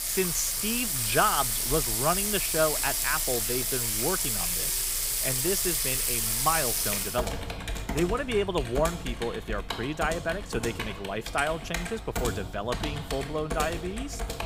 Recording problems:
household noises; very loud; throughout; 2 dB above the speech

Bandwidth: 15.5 kHz